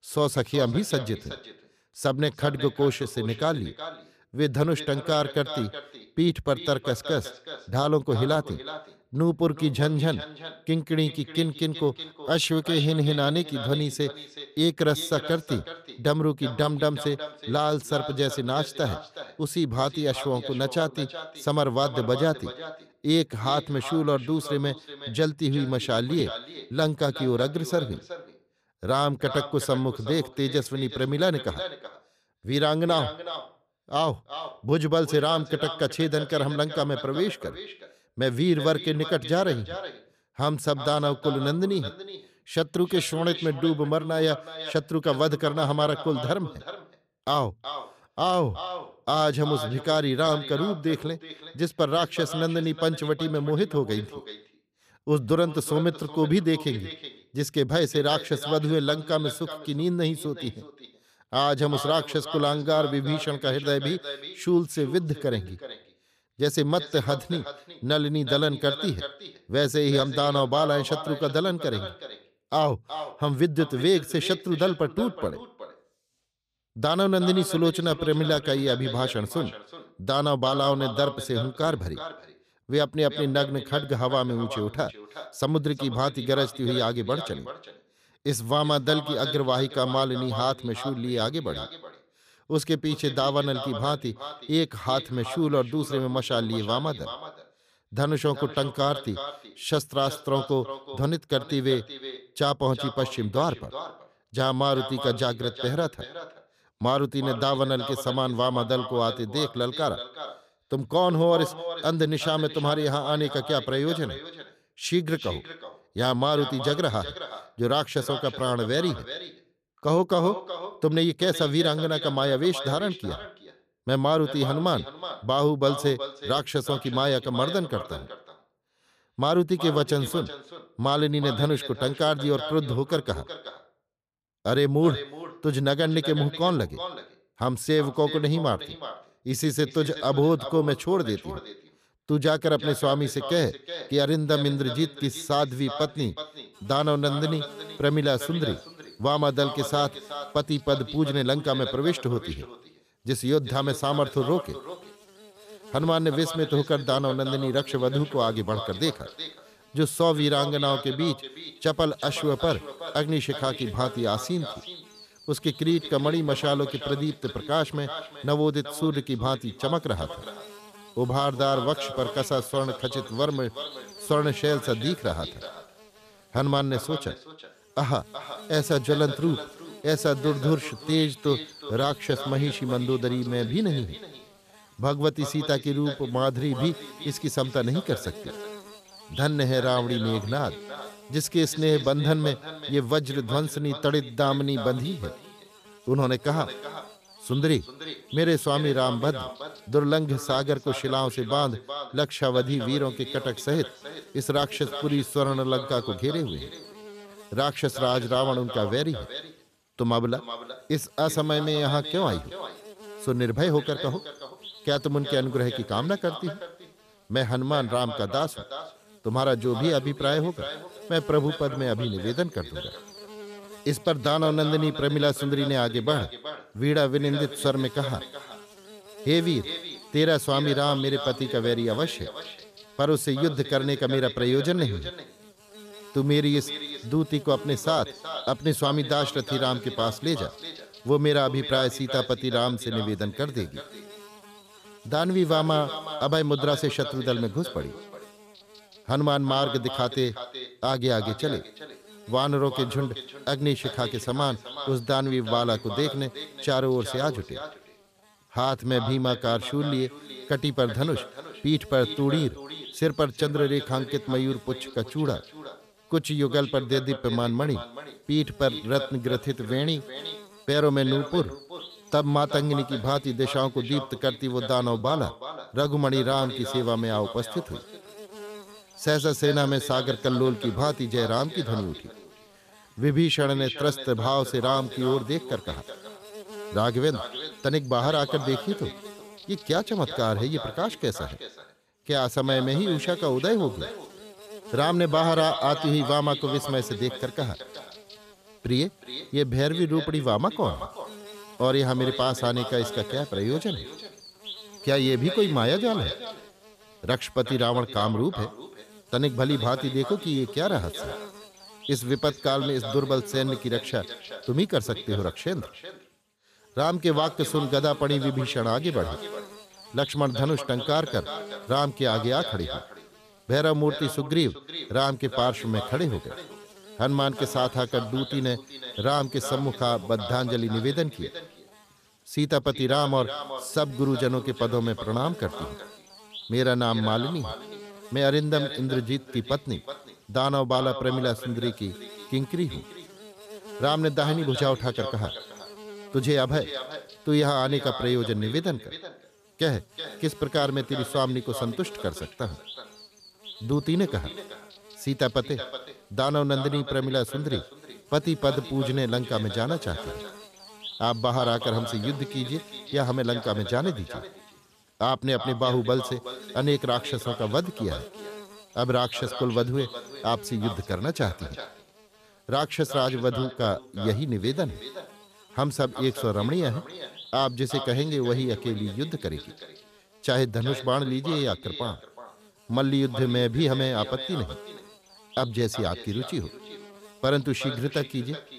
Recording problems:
echo of what is said; strong; throughout; 370 ms later, 10 dB below the speech
electrical hum; noticeable; from 2:27 on; 50 Hz, 20 dB below the speech

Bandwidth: 14.5 kHz